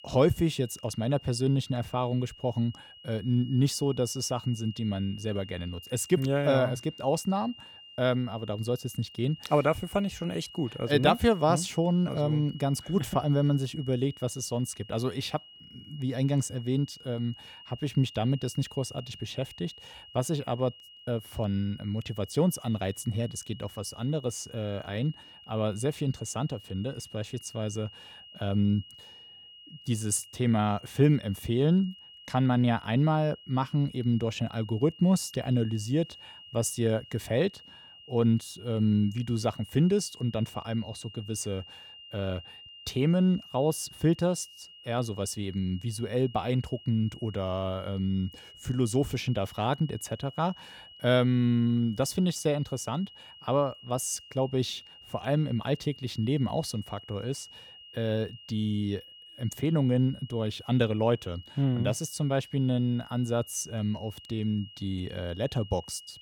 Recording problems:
high-pitched whine; noticeable; throughout; 3 kHz, 20 dB below the speech

